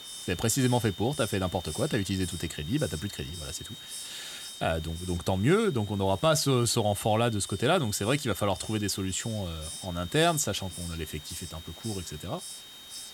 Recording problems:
high-pitched whine; noticeable; throughout; 3.5 kHz, 15 dB below the speech
hiss; noticeable; throughout; 15 dB below the speech

